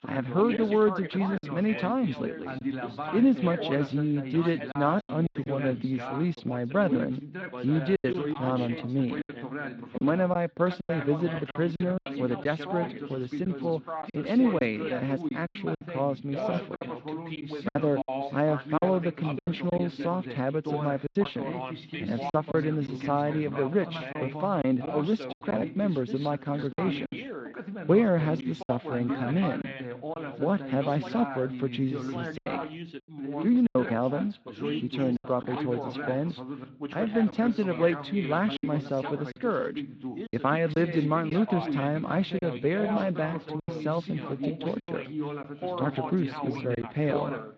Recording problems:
muffled; very; fading above 4 kHz
garbled, watery; slightly
background chatter; loud; throughout; 2 voices, 7 dB below the speech
choppy; very; 6% of the speech affected

